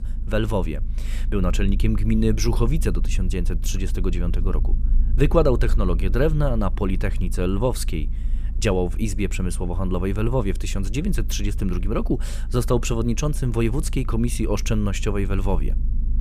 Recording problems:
low rumble; noticeable; throughout; 20 dB below the speech

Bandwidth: 14.5 kHz